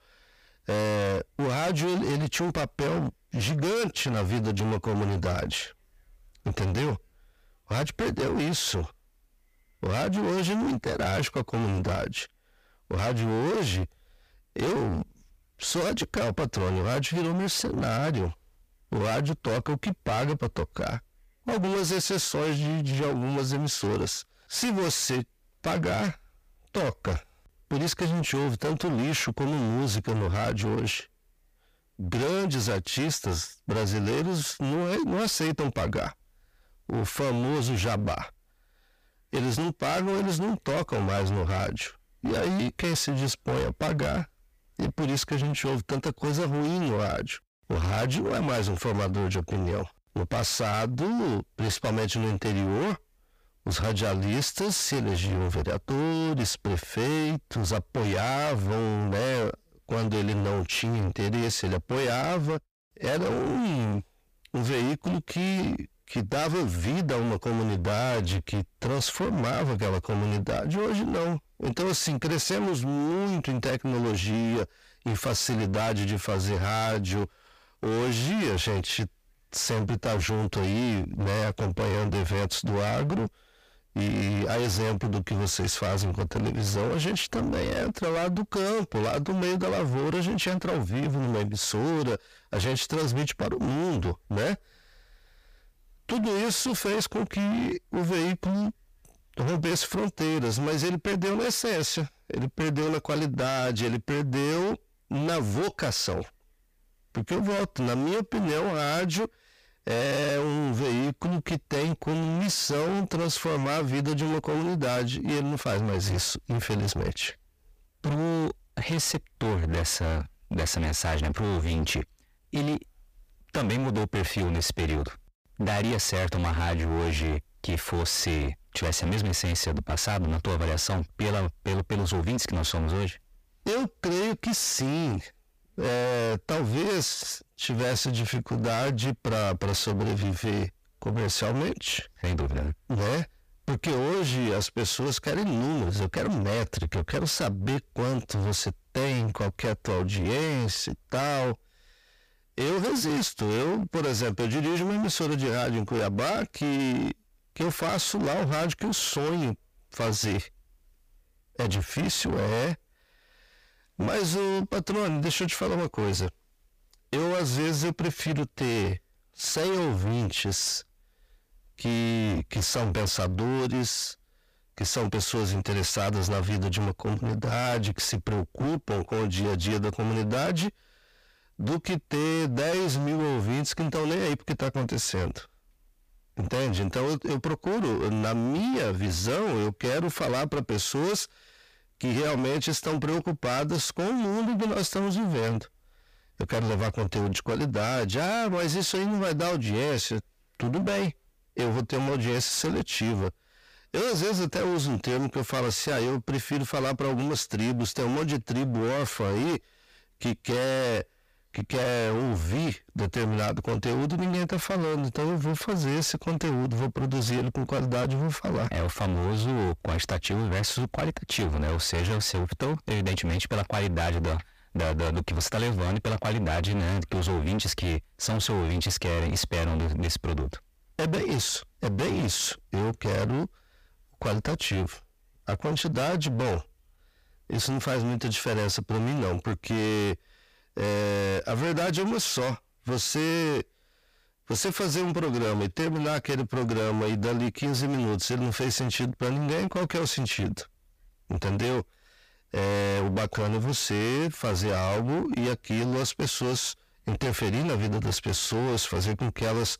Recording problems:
distortion; heavy; 34% of the sound clipped

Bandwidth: 15 kHz